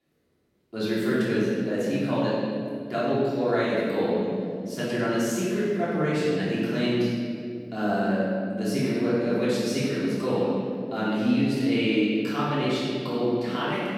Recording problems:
room echo; strong; dies away in 2.4 s
off-mic speech; far

